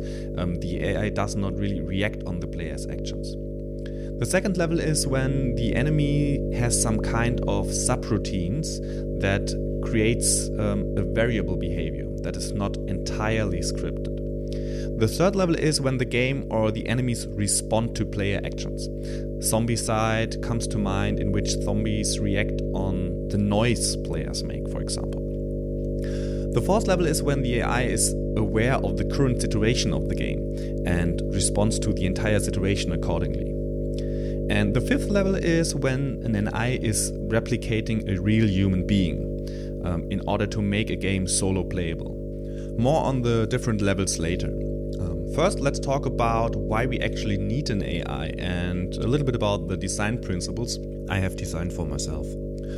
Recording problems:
electrical hum; loud; throughout; 50 Hz, 6 dB below the speech

